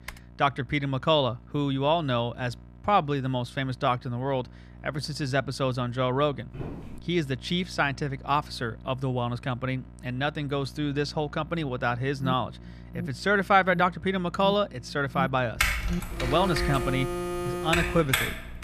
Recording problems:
alarms or sirens; loud; from 12 s on; 7 dB below the speech
electrical hum; faint; throughout; 60 Hz, 30 dB below the speech
keyboard typing; faint; at the start; peak 15 dB below the speech
footsteps; faint; at 6.5 s; peak 10 dB below the speech
keyboard typing; loud; from 16 s on; peak 2 dB above the speech

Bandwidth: 14.5 kHz